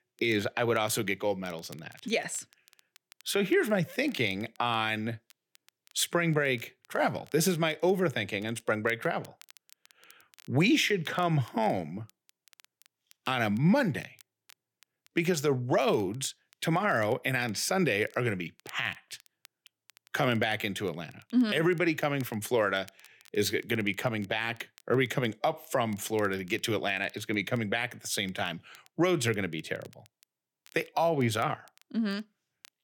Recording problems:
crackle, like an old record; faint; 30 dB below the speech

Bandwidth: 18 kHz